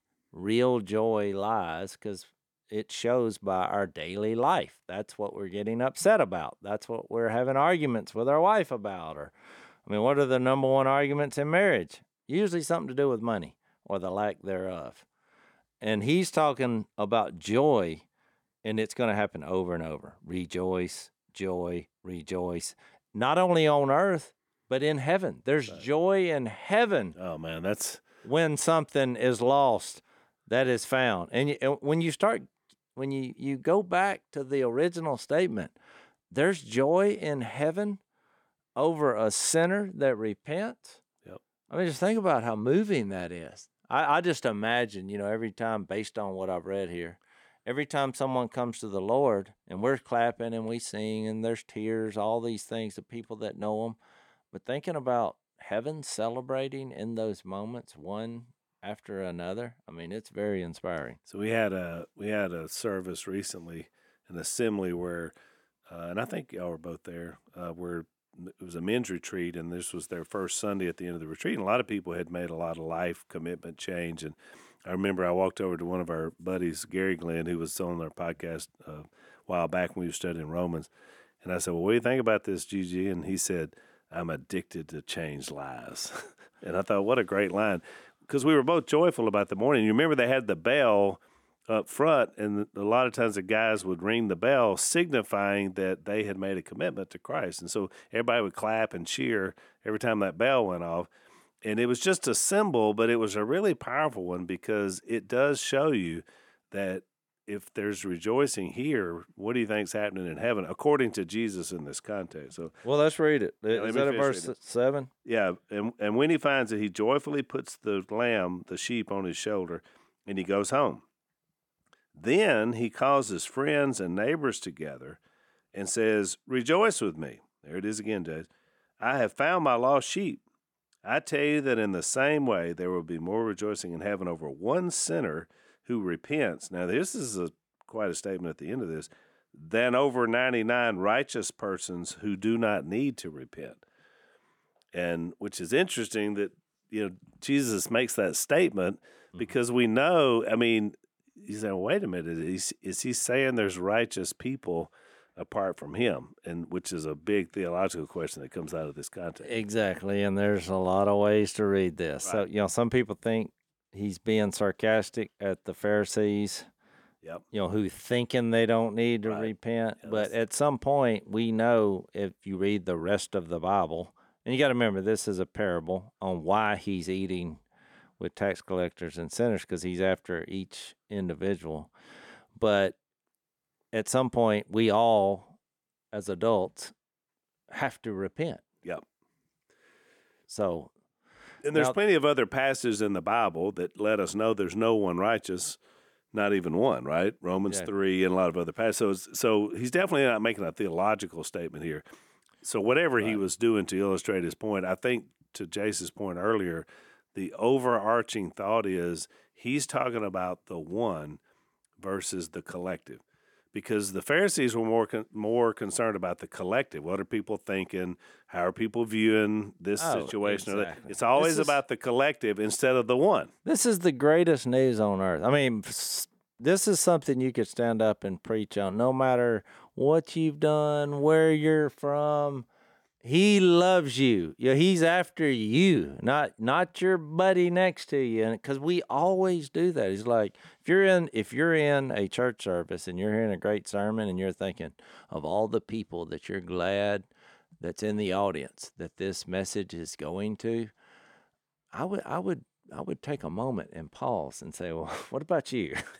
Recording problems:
none

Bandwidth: 17.5 kHz